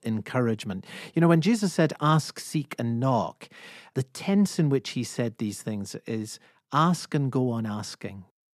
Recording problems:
none

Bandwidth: 14 kHz